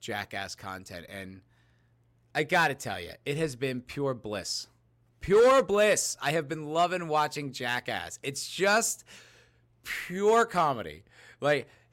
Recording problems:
none

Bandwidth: 16 kHz